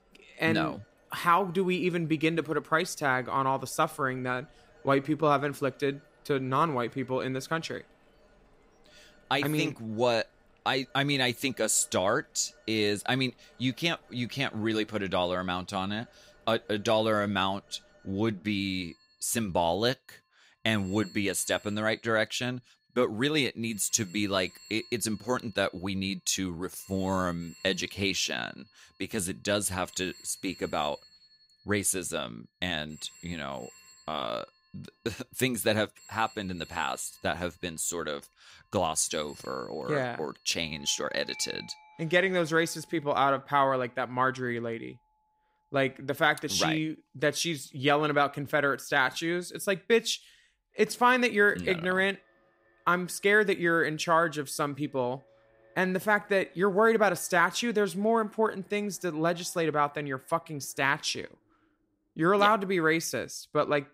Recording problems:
alarms or sirens; faint; throughout; 25 dB below the speech

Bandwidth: 15.5 kHz